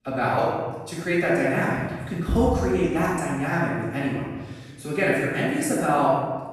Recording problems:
room echo; strong; dies away in 1.2 s
off-mic speech; far

